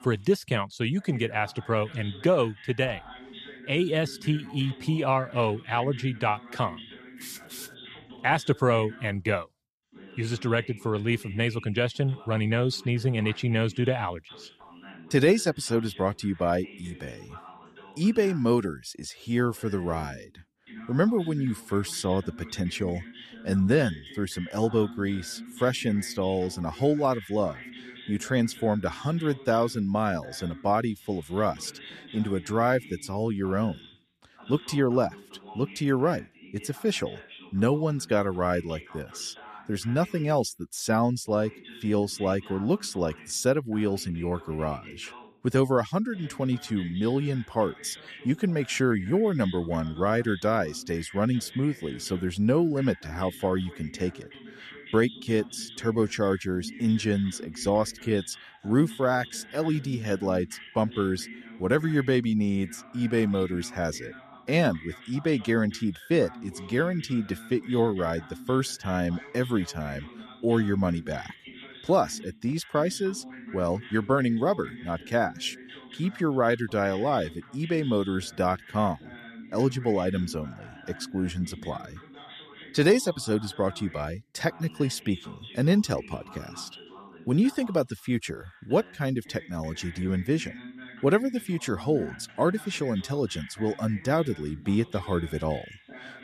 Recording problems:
voice in the background; noticeable; throughout; 20 dB below the speech

